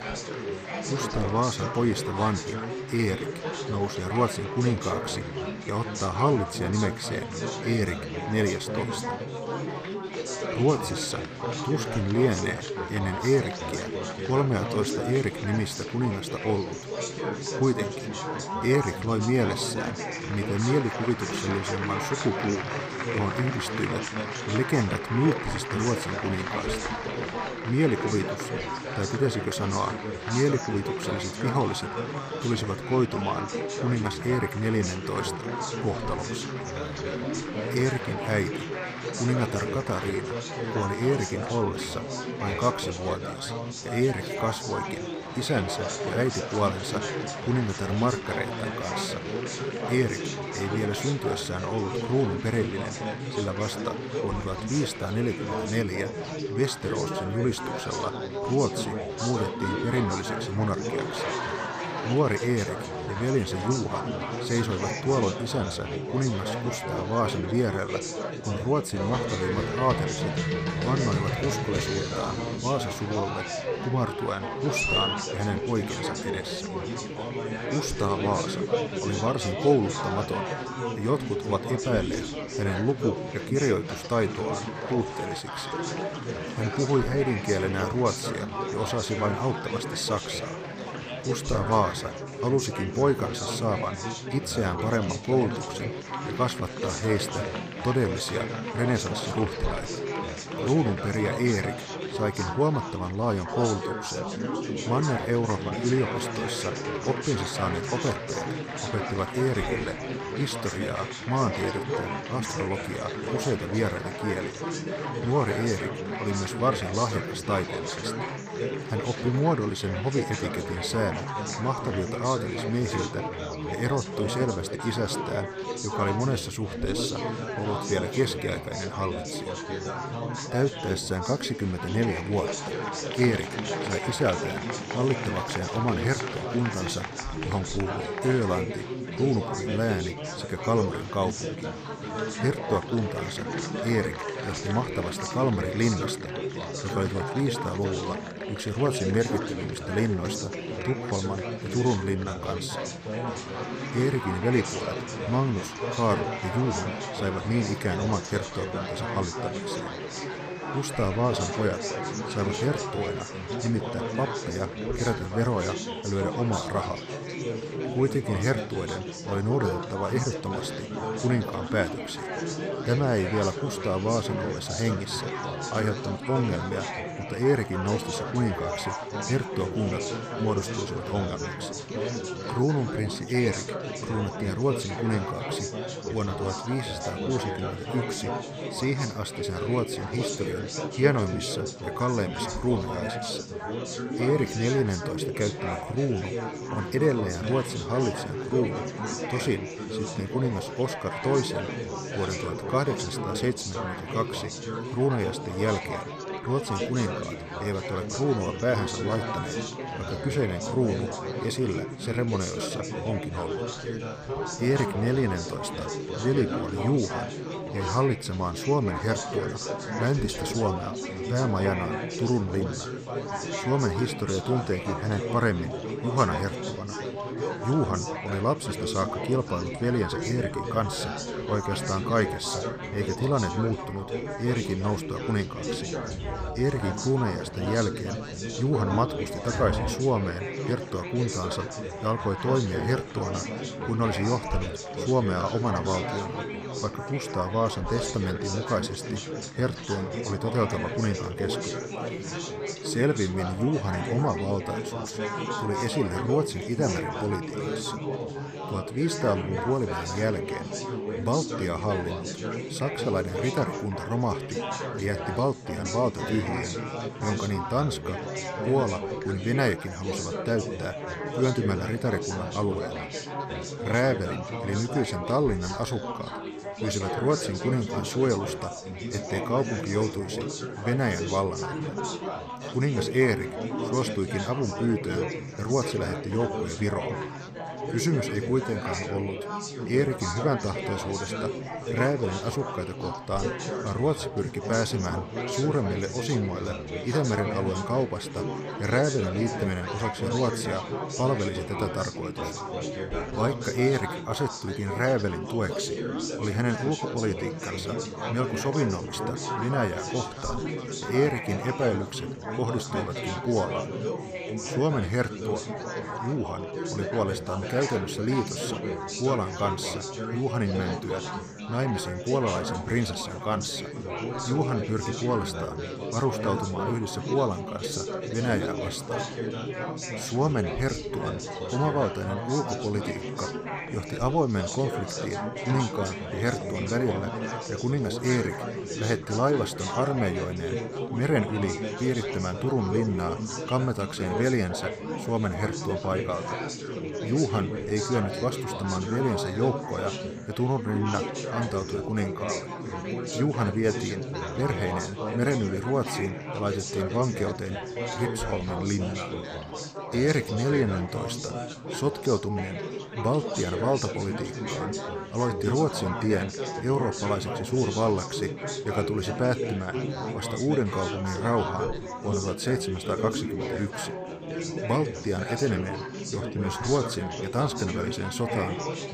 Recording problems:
chatter from many people; loud; throughout; 3 dB below the speech

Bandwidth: 15 kHz